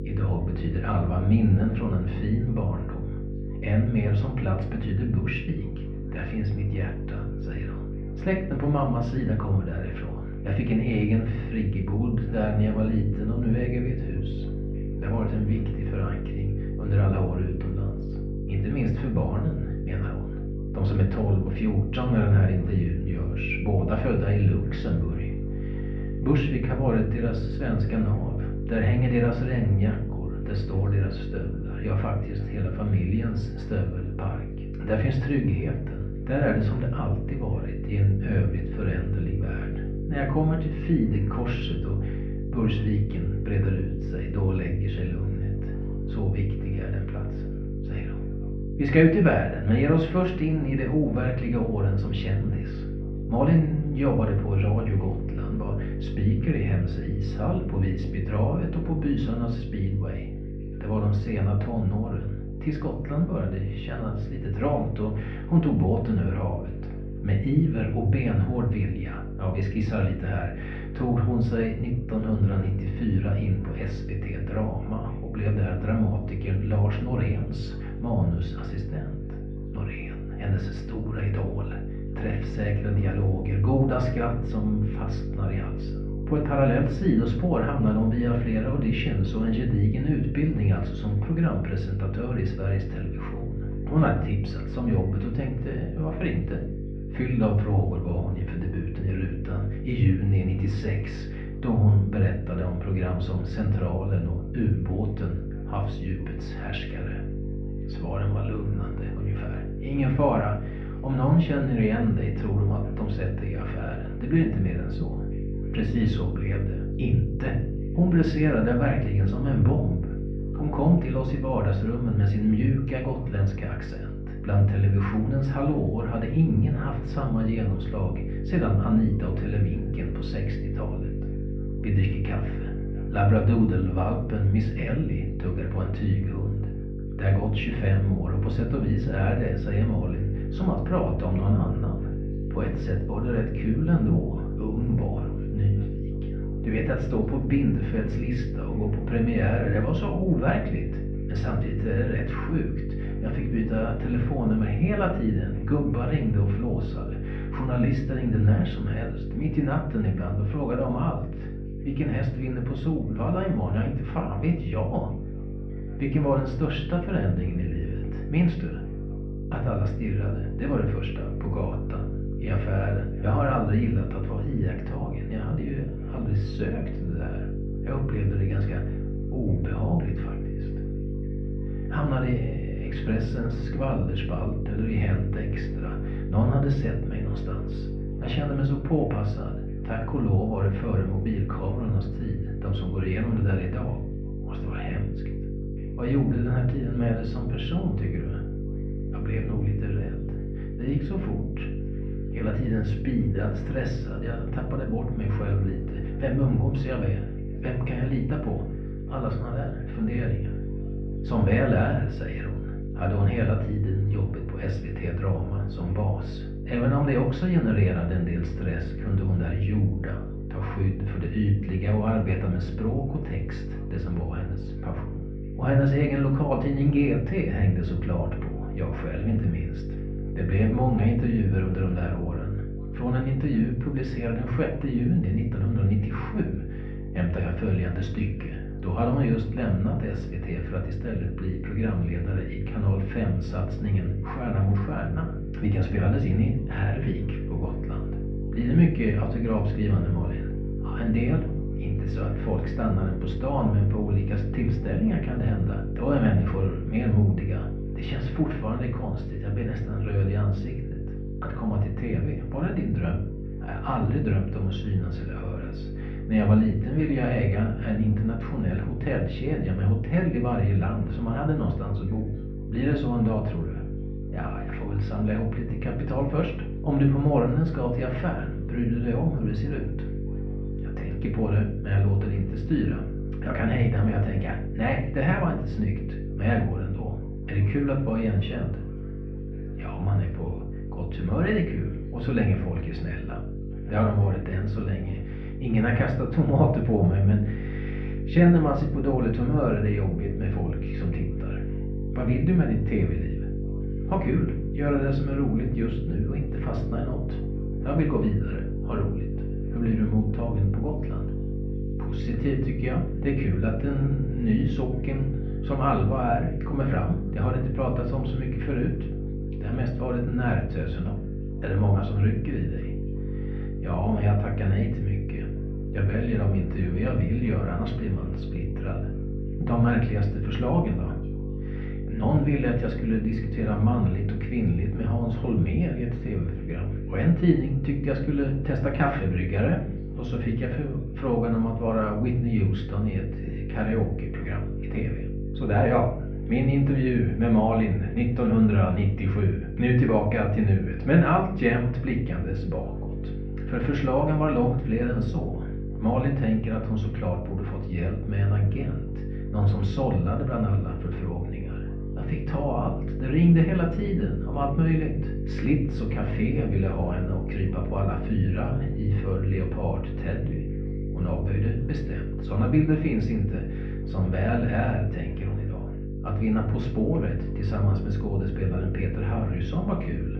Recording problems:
muffled; very; fading above 2.5 kHz
room echo; slight; dies away in 0.4 s
off-mic speech; somewhat distant
electrical hum; loud; throughout; 50 Hz, 9 dB below the speech
background chatter; faint; throughout; 3 voices, 30 dB below the speech

